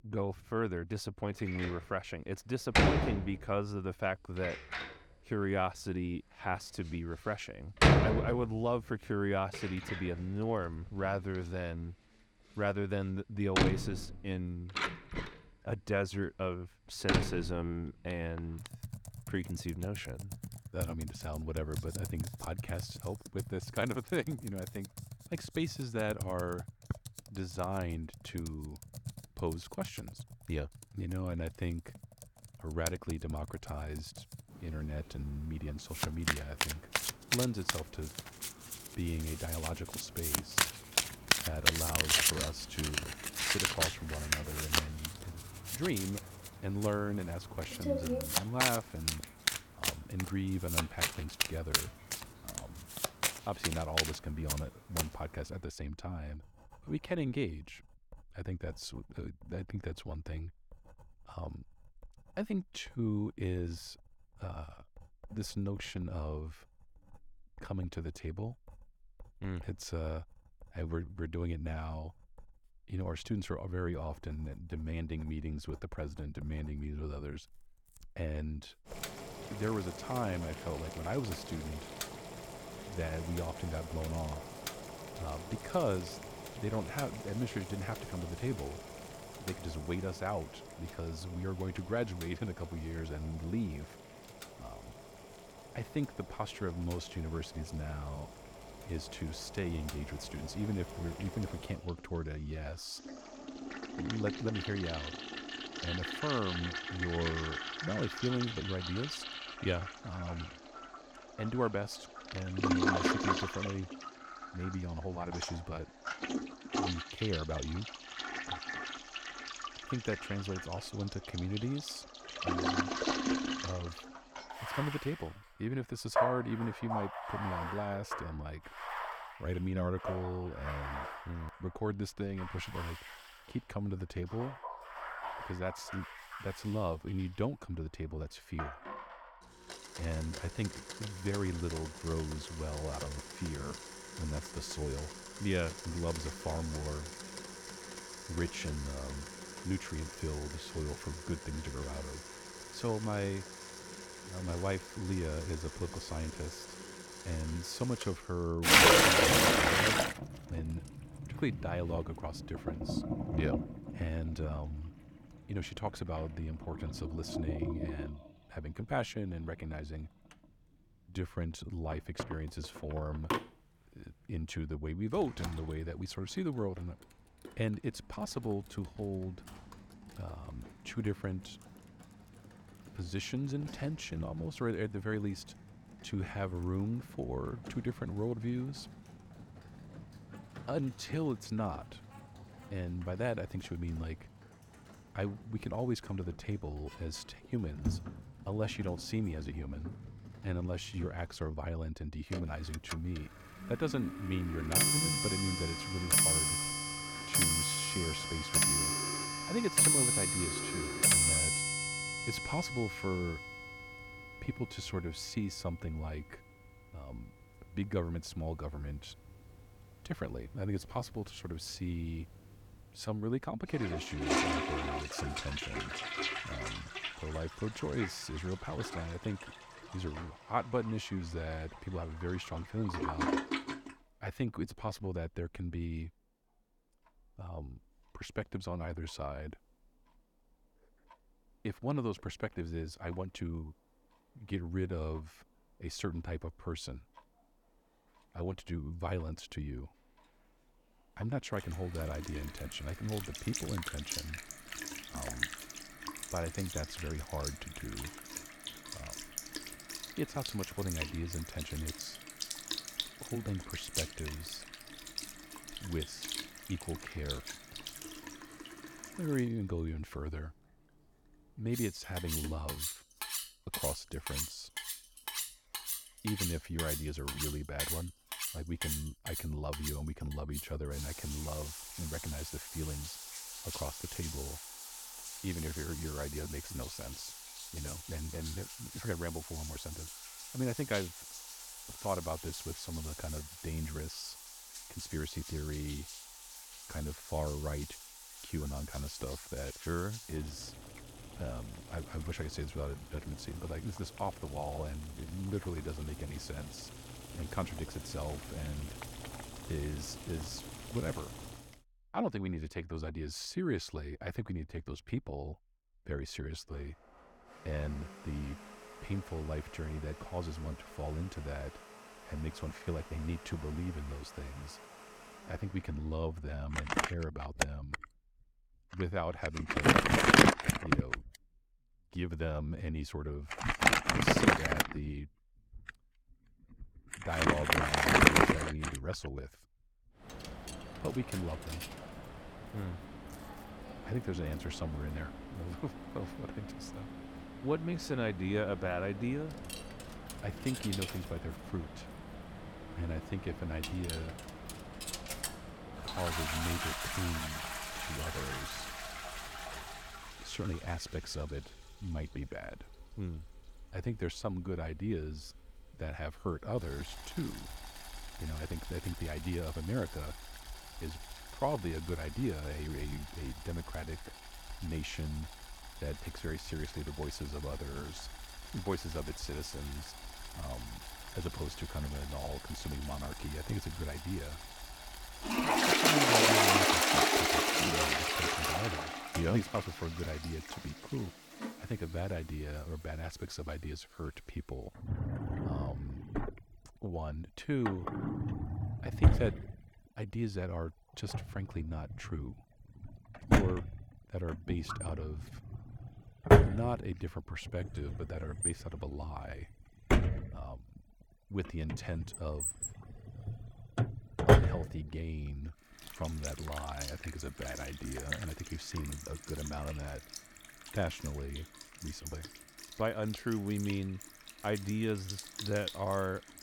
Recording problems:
household noises; very loud; throughout; 4 dB above the speech

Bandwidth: 18 kHz